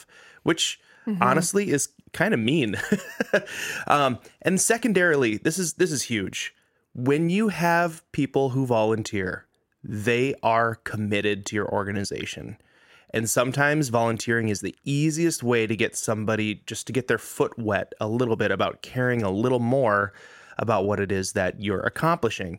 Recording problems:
none

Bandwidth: 16 kHz